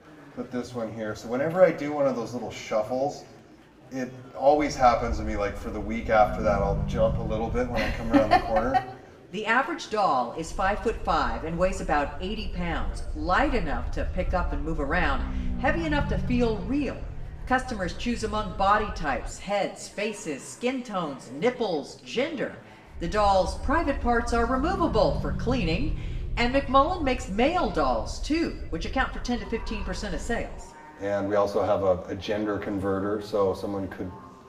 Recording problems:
room echo; slight; dies away in 0.6 s
off-mic speech; somewhat distant
murmuring crowd; faint; throughout; 25 dB below the speech
low rumble; faint; from 4.5 to 8.5 s, from 10 to 19 s and from 23 to 31 s; 20 dB below the speech

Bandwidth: 15.5 kHz